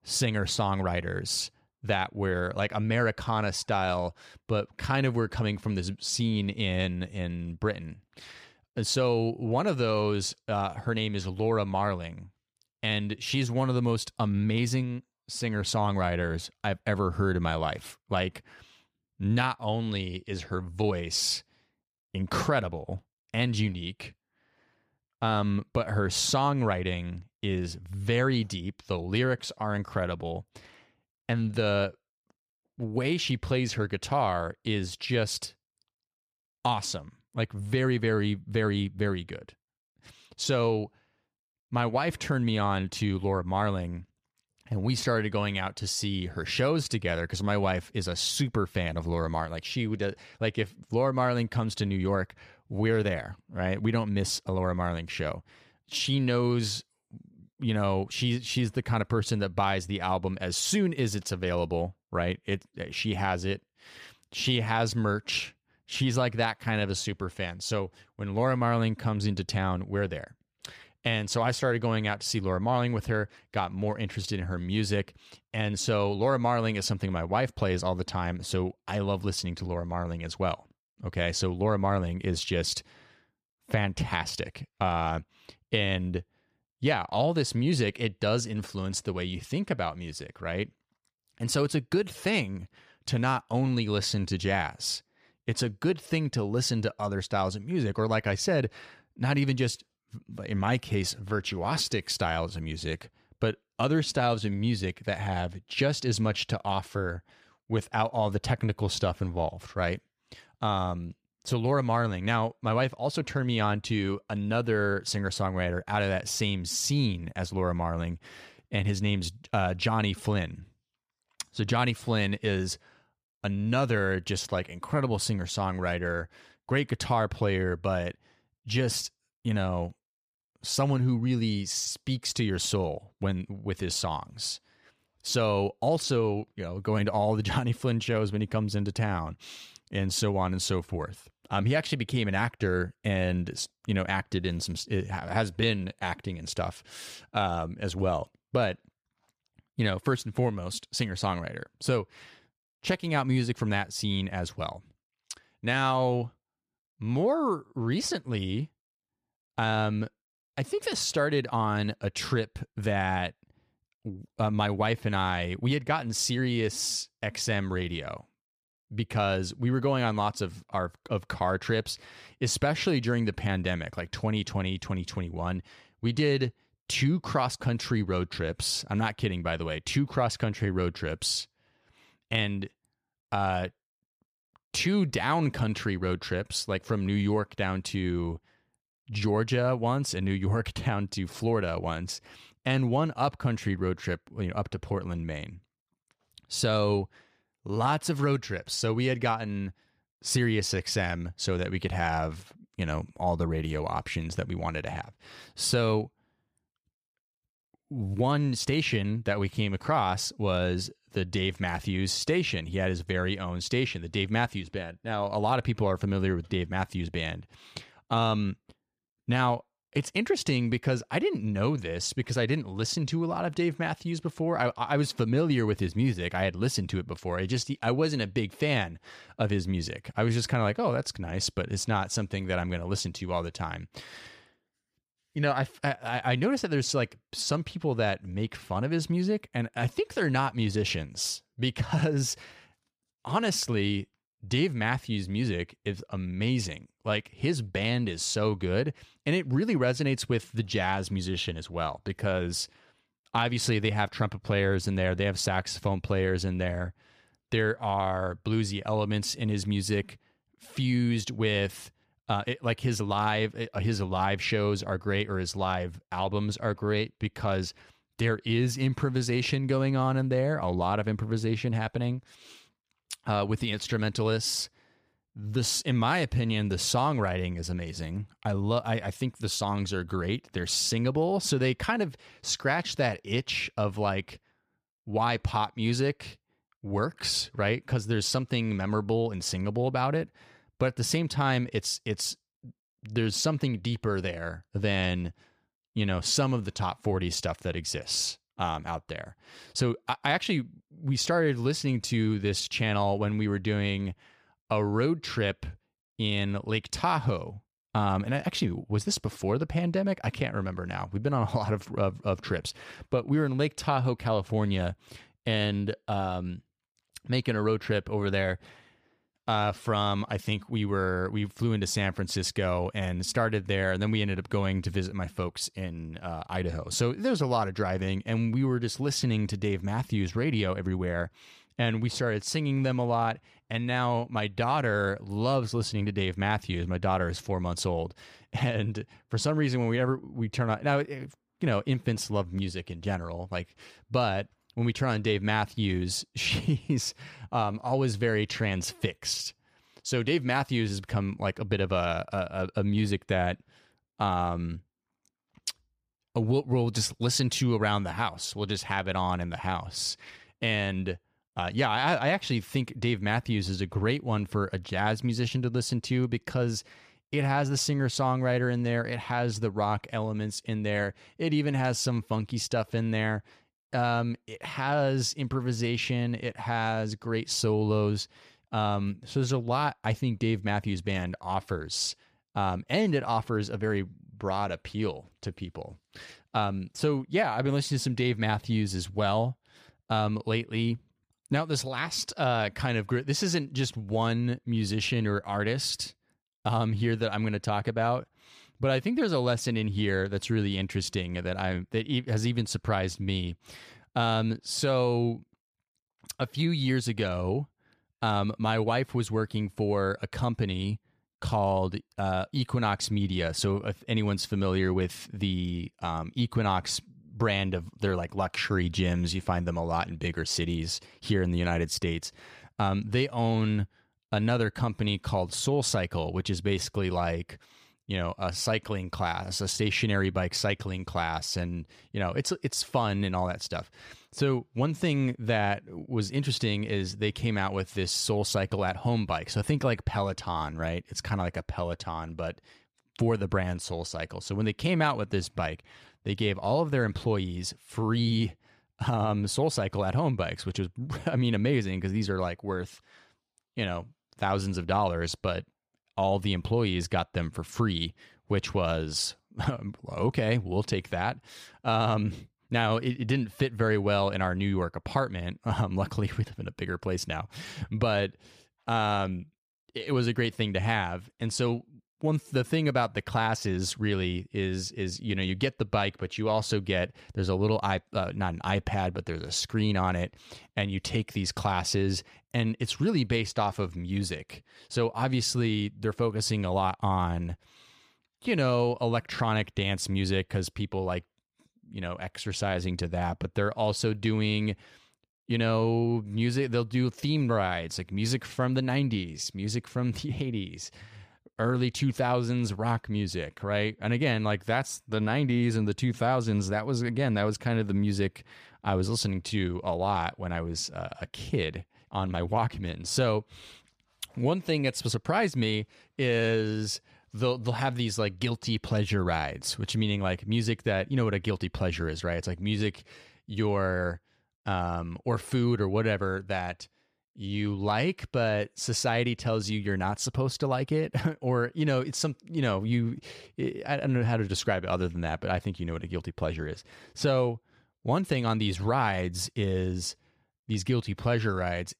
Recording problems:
none

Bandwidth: 14.5 kHz